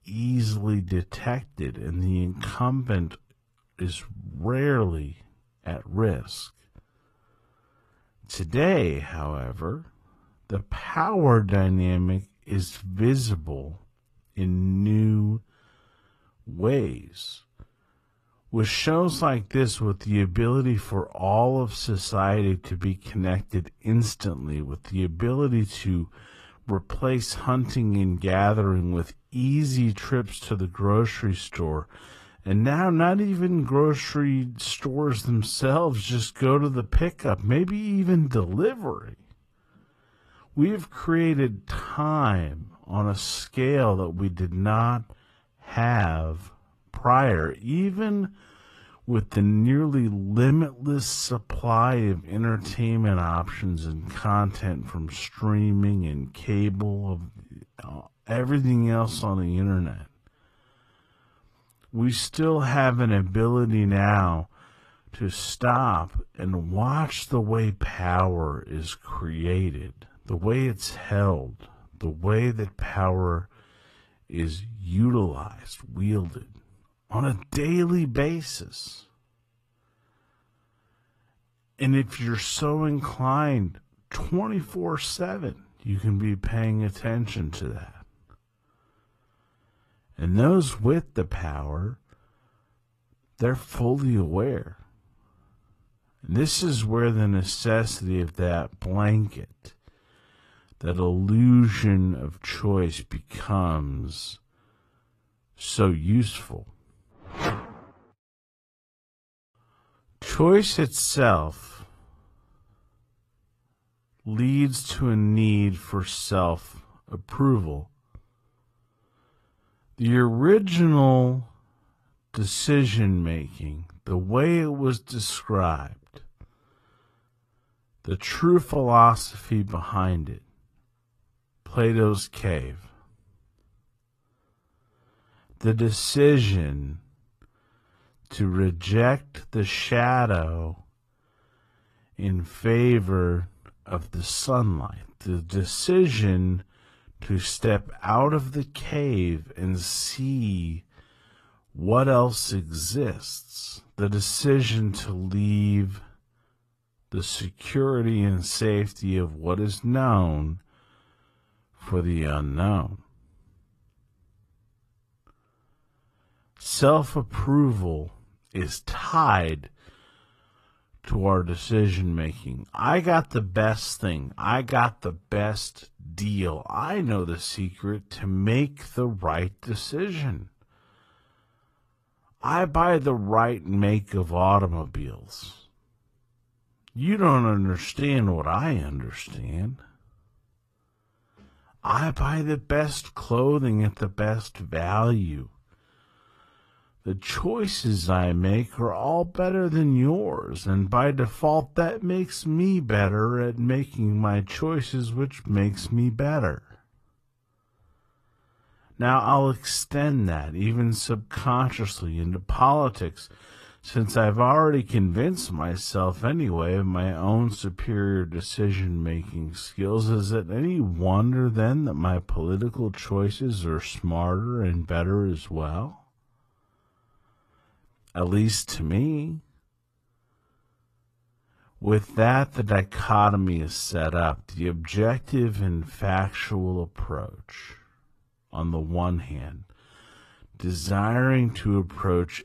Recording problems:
wrong speed, natural pitch; too slow; 0.6 times normal speed
garbled, watery; slightly; nothing above 14 kHz

